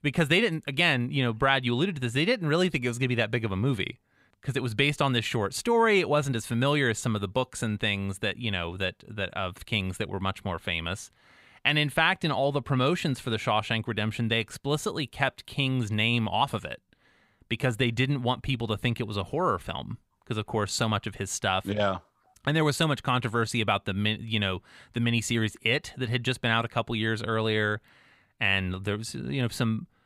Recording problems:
none

